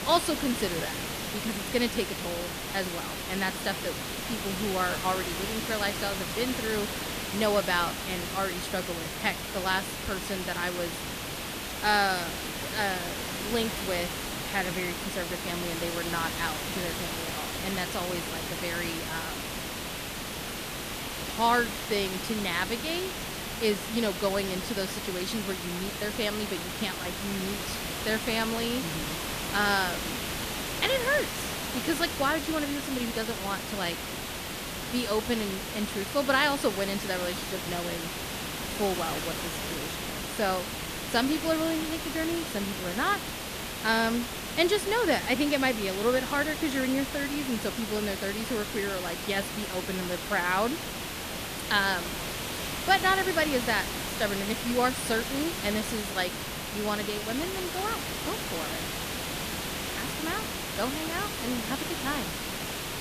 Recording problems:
hiss; loud; throughout; 3 dB below the speech

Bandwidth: 14.5 kHz